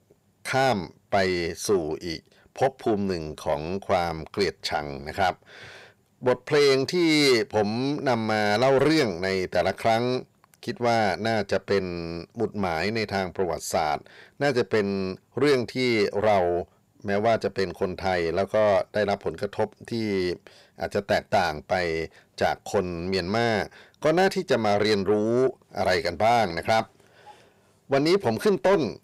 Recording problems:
distortion; slight; 10 dB below the speech

